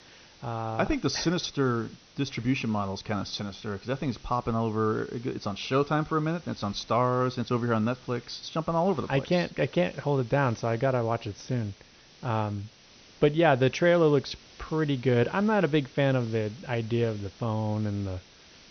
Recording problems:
high frequencies cut off; noticeable; nothing above 6 kHz
hiss; faint; throughout; 25 dB below the speech

